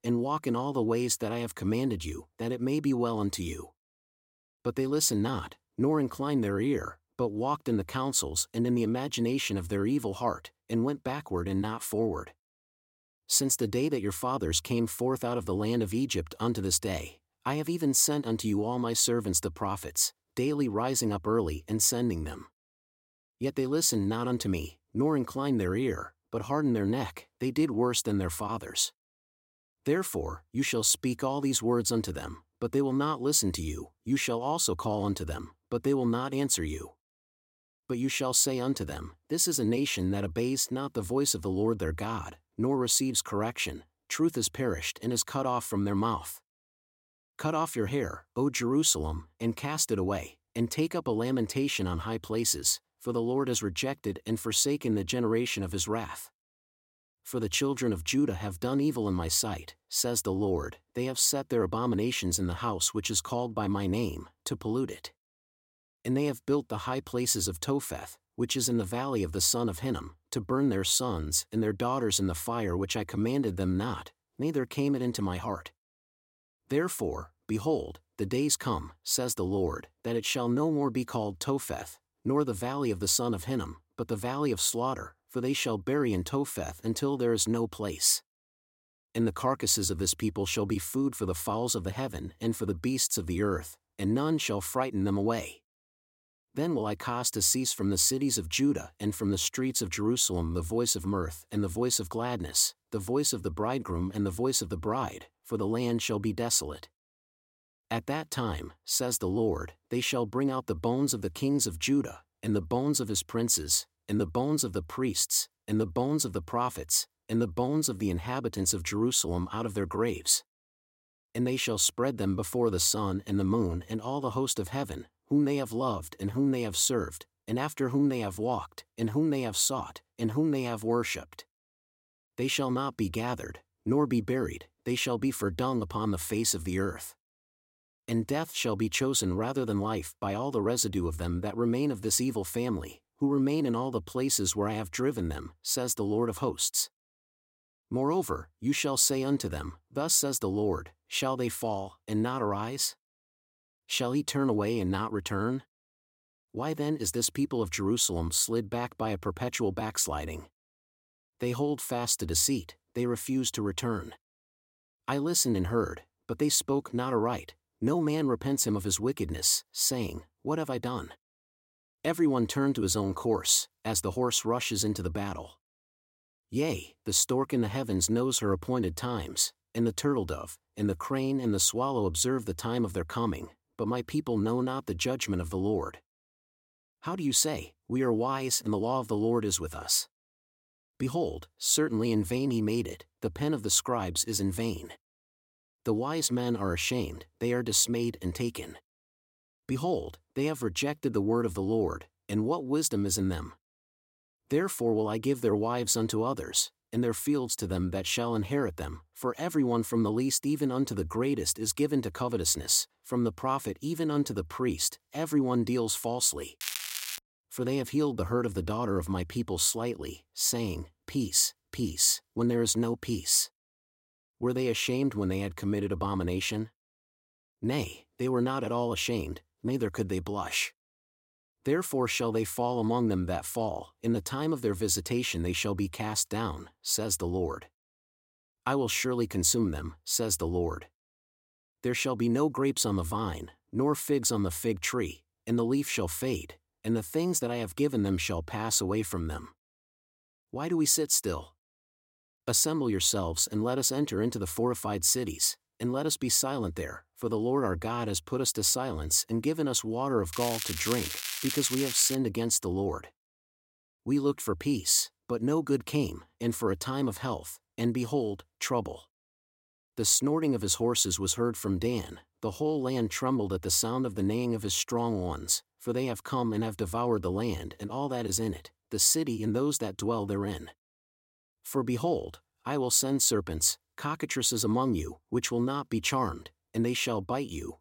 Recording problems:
crackling; loud; at 3:37 and from 4:20 to 4:22; 5 dB below the speech

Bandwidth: 16.5 kHz